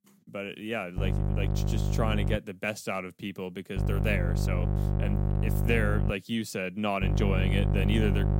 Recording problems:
electrical hum; loud; from 1 to 2.5 s, from 4 to 6 s and from 7 s on; 50 Hz, 6 dB below the speech

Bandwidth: 16 kHz